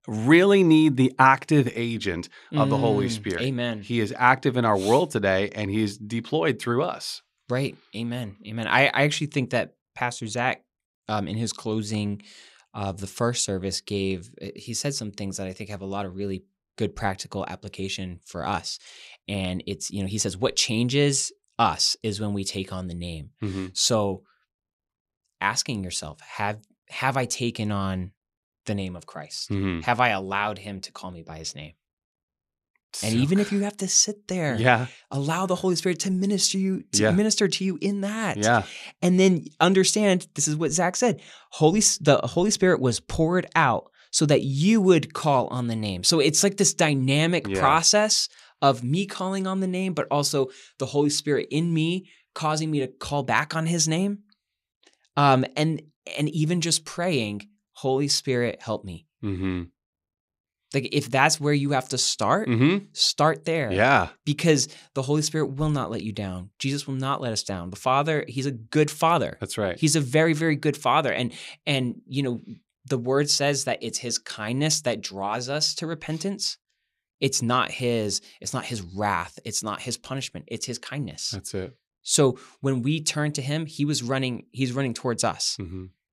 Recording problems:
none

